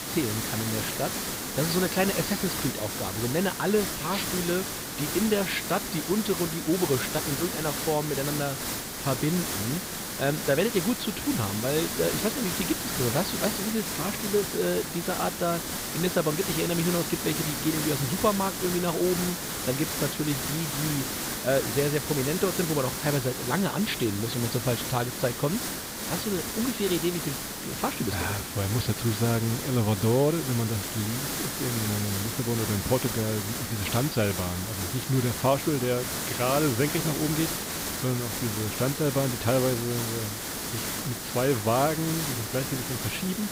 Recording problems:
high frequencies cut off; severe; nothing above 5 kHz
hiss; loud; throughout; 2 dB below the speech

